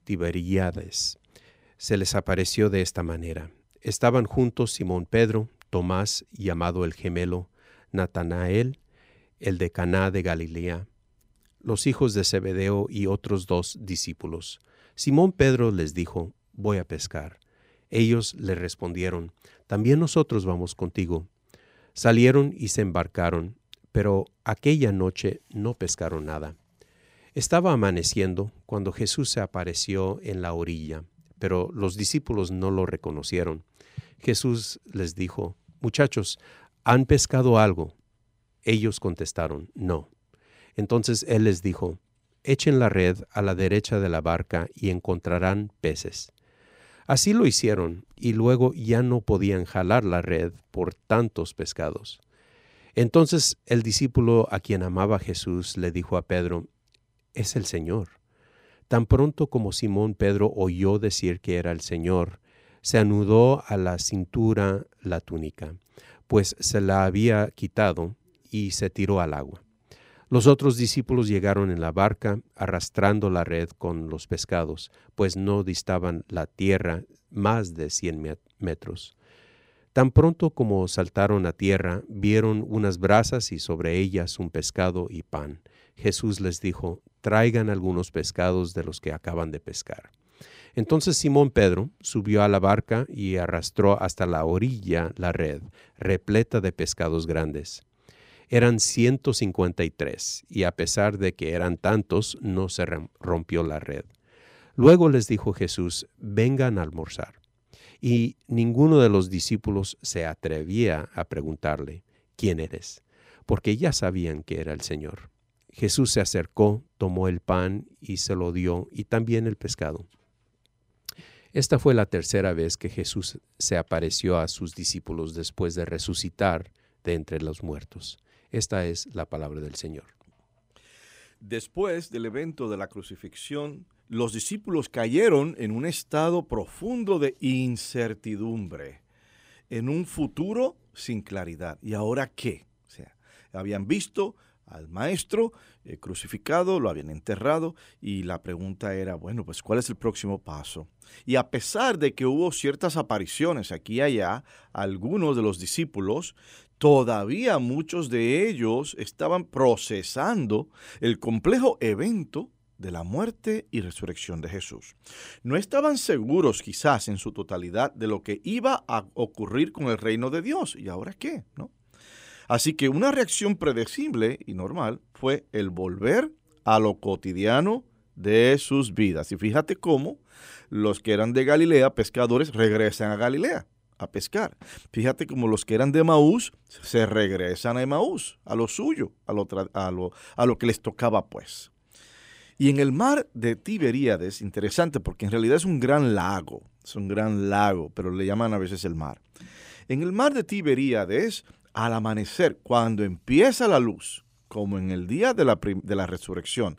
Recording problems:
none

